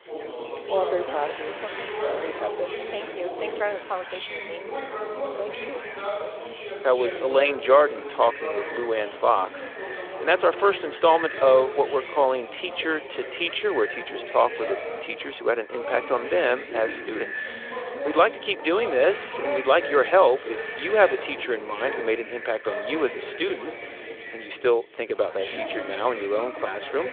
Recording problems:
echo of what is said; noticeable; from 7.5 s on; 400 ms later, 15 dB below the speech
phone-call audio; nothing above 3.5 kHz
background chatter; loud; throughout; 4 voices, 9 dB below the speech
traffic noise; noticeable; throughout; 20 dB below the speech

